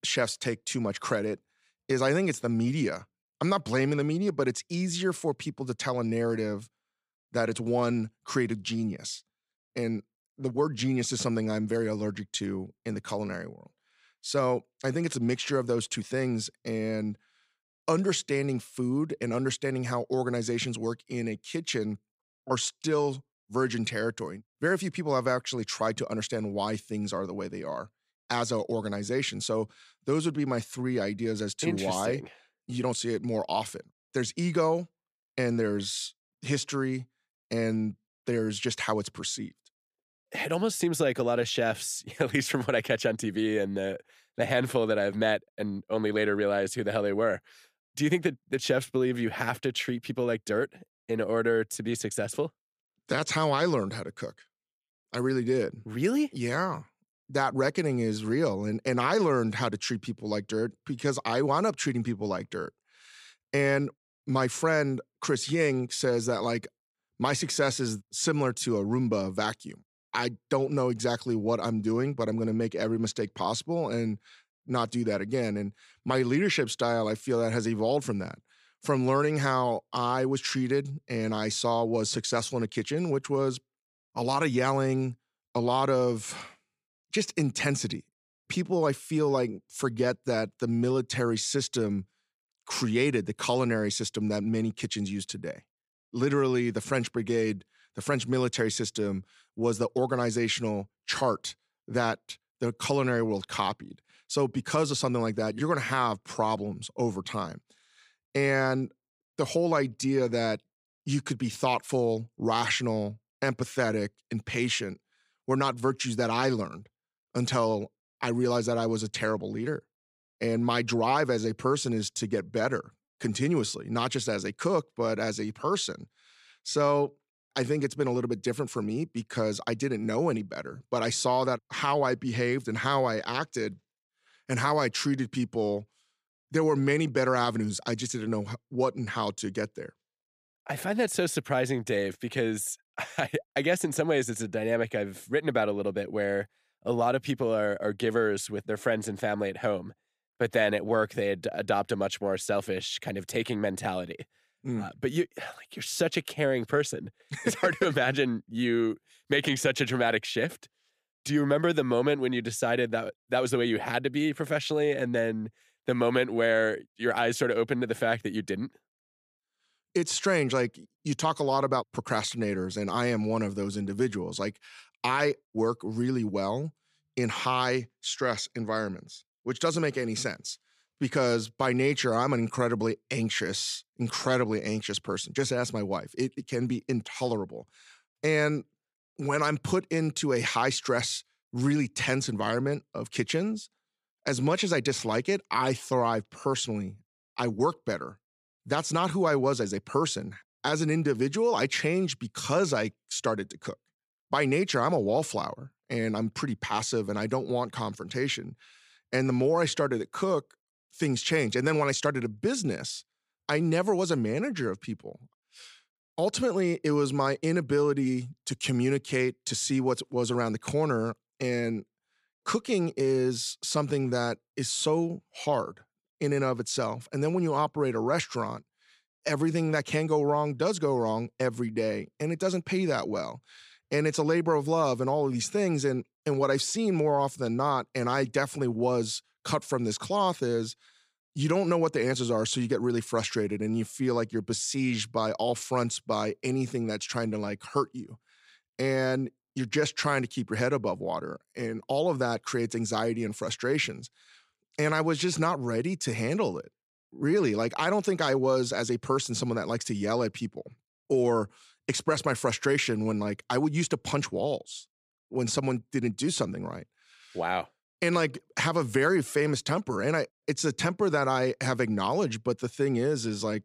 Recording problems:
none

